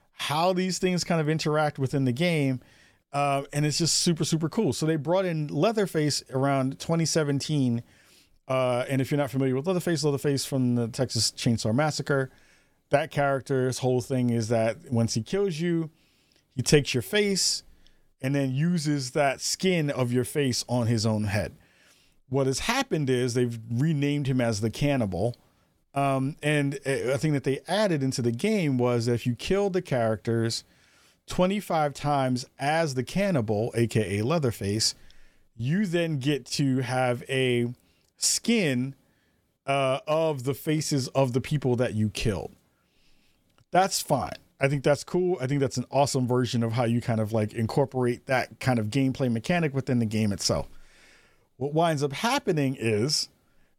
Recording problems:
none

